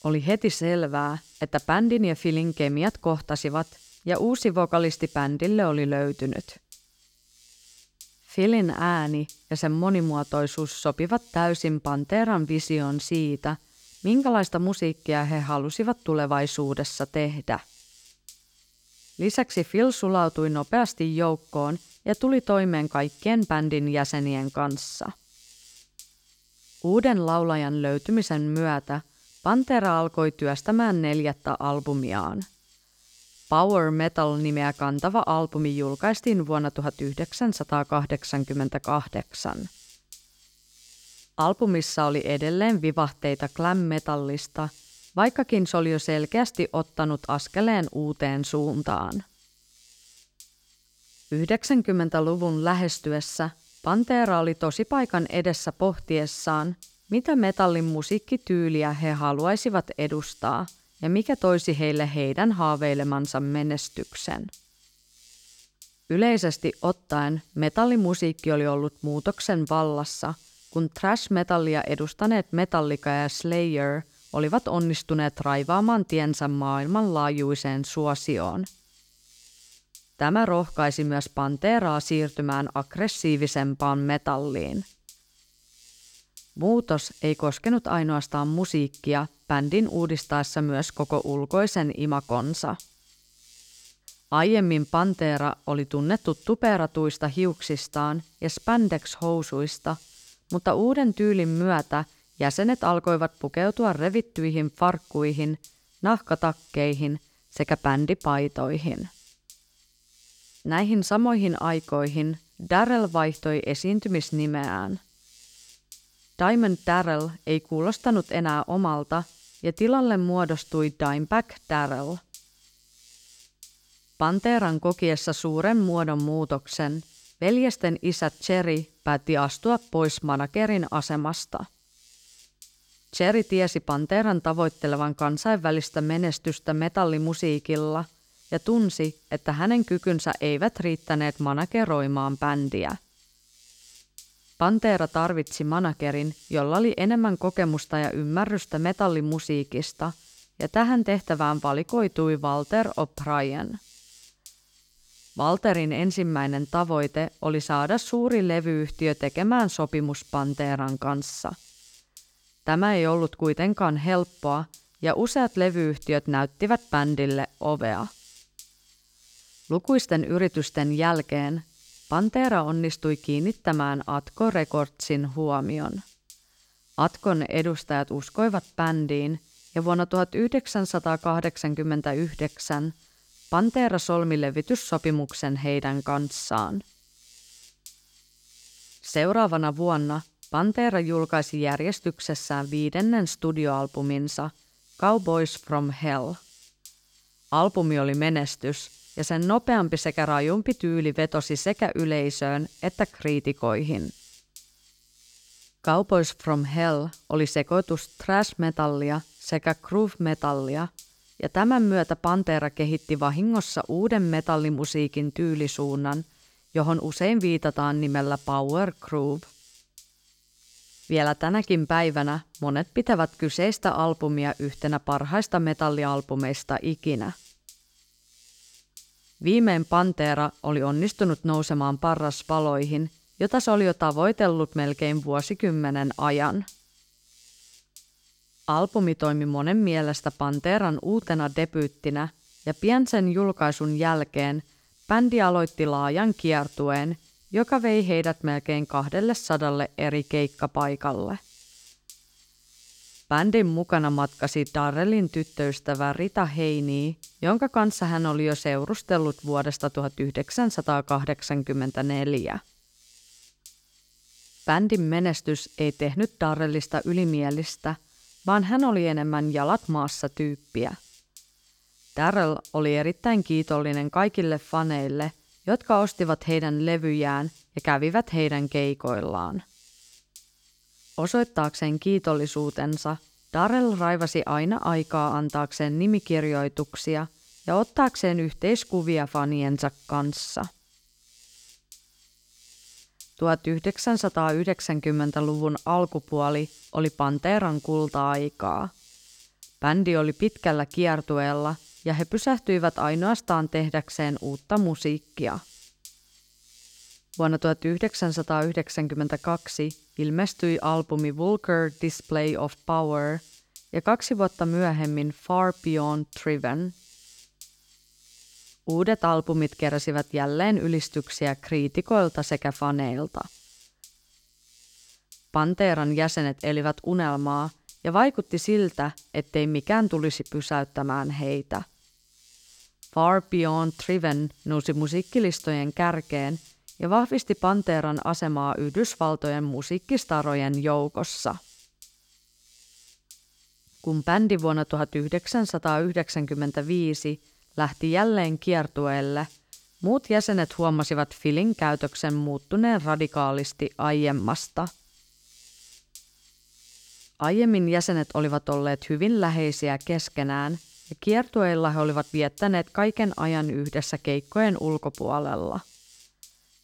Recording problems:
electrical hum; faint; throughout; 50 Hz, 25 dB below the speech

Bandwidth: 17.5 kHz